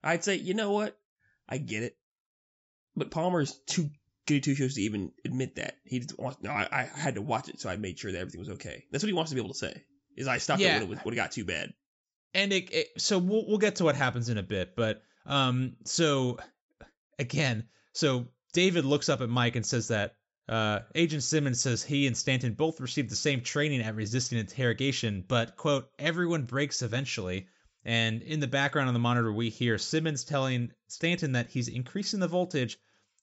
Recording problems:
high frequencies cut off; noticeable; nothing above 7.5 kHz

